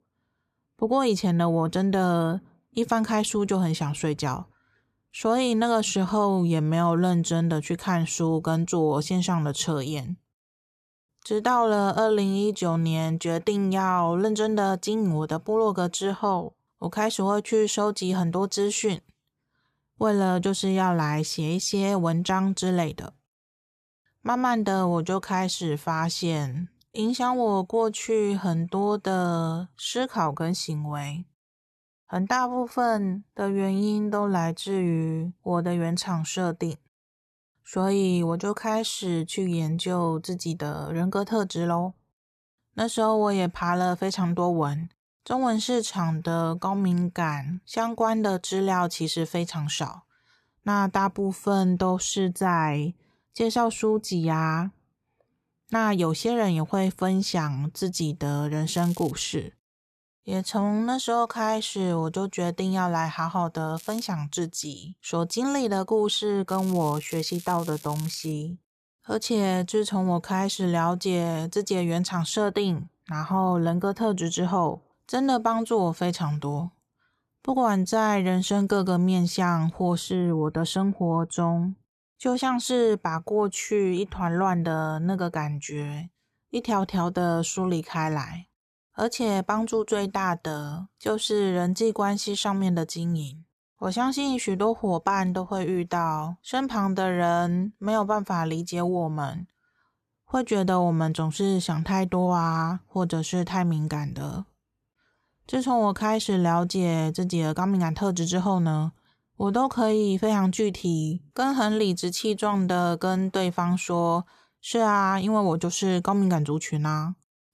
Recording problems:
crackling; noticeable; at 59 s, at 1:04 and from 1:06 to 1:08; 15 dB below the speech

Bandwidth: 14 kHz